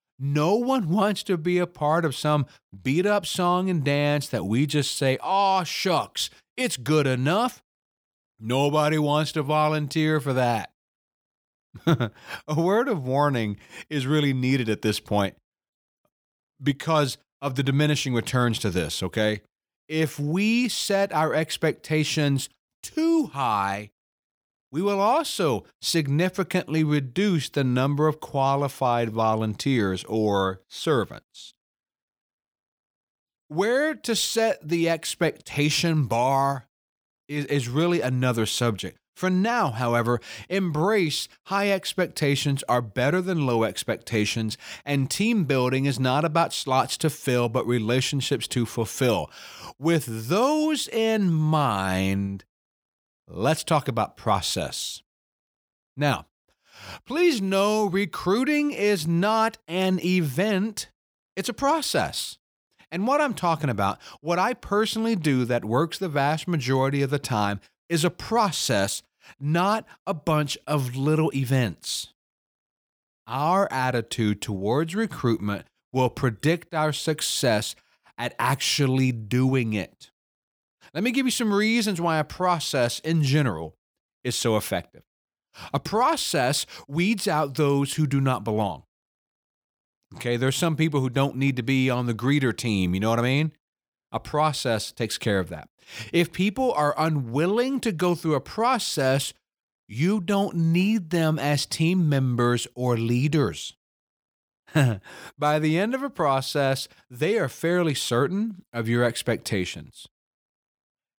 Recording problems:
none

